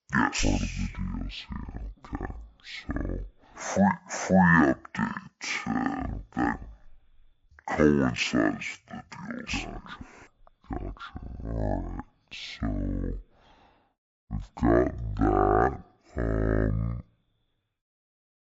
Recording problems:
wrong speed and pitch; too slow and too low; 0.5 times normal speed

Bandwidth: 7.5 kHz